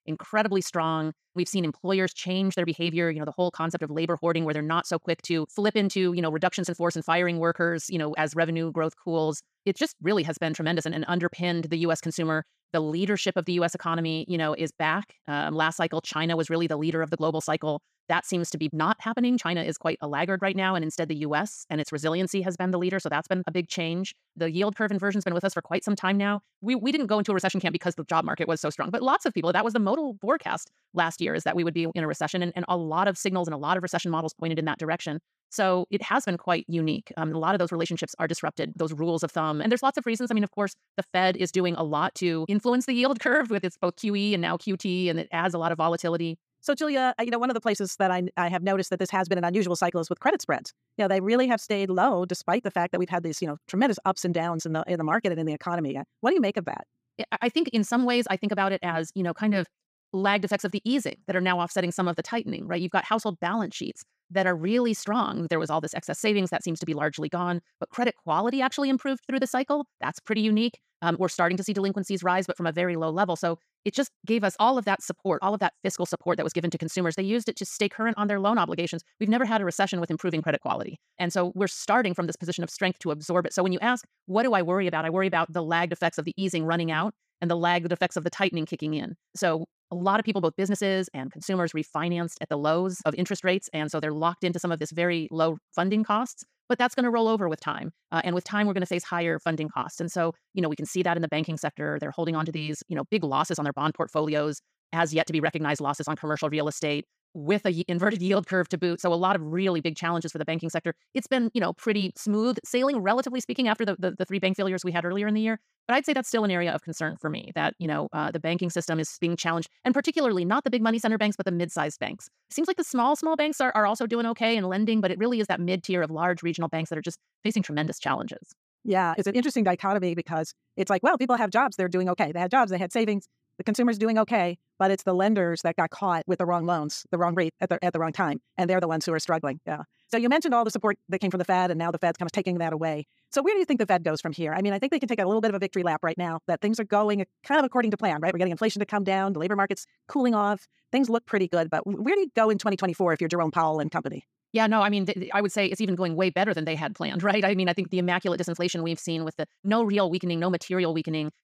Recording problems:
wrong speed, natural pitch; too fast; 1.7 times normal speed

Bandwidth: 15 kHz